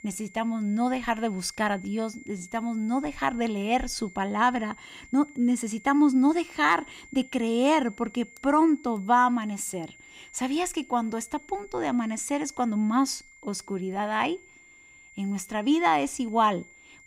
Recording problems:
high-pitched whine; faint; throughout; 2 kHz, 25 dB below the speech

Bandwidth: 15.5 kHz